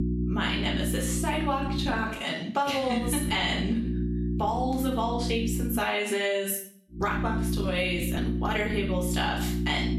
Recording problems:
off-mic speech; far
room echo; slight; dies away in 0.5 s
squashed, flat; somewhat
electrical hum; noticeable; until 2 s, from 3 to 6 s and from 7 s on; 60 Hz, 10 dB below the speech
uneven, jittery; slightly; from 1.5 to 9 s

